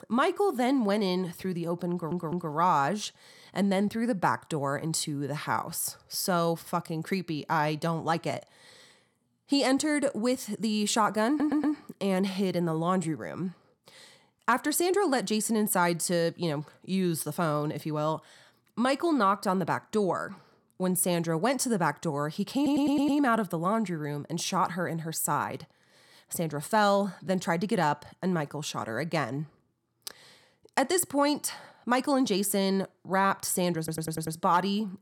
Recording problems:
audio stuttering; 4 times, first at 2 s

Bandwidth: 17 kHz